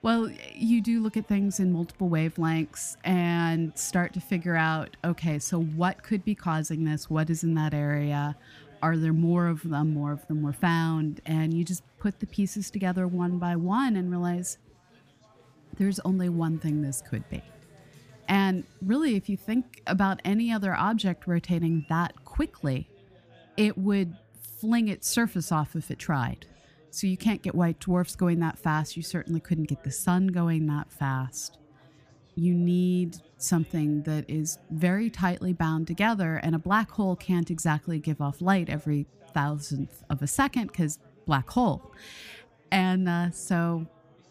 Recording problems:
chatter from many people; faint; throughout; 30 dB below the speech

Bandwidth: 15 kHz